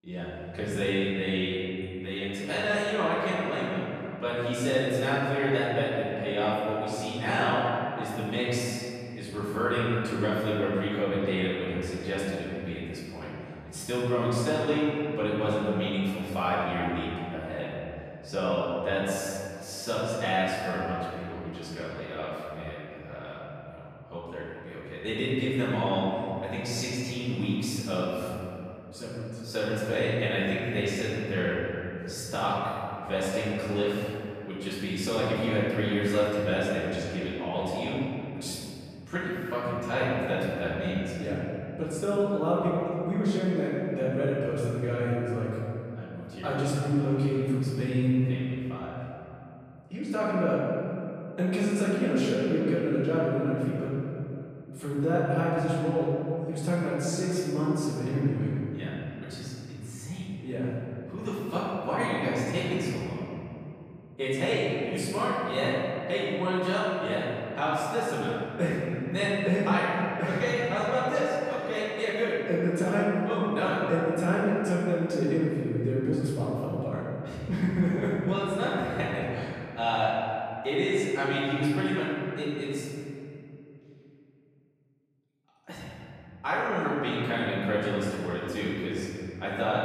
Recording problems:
room echo; strong; dies away in 2.7 s
off-mic speech; far

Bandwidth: 15 kHz